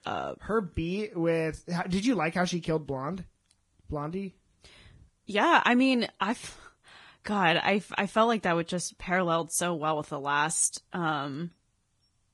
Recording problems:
garbled, watery; badly; nothing above 10.5 kHz

